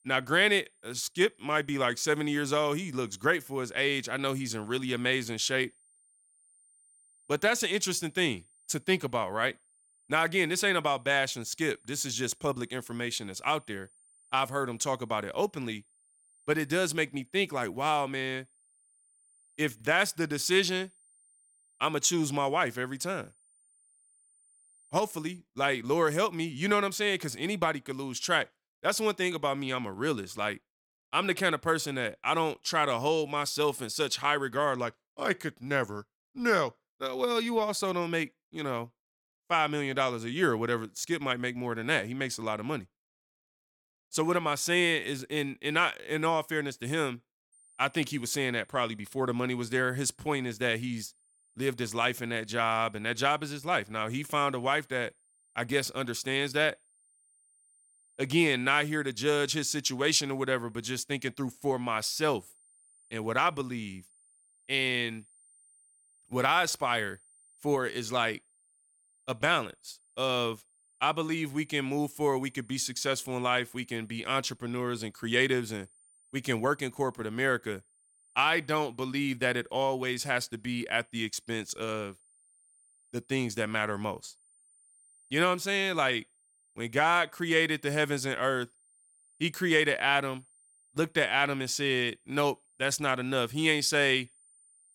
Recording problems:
high-pitched whine; faint; until 25 s and from 48 s on; 9 kHz, 30 dB below the speech

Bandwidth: 17 kHz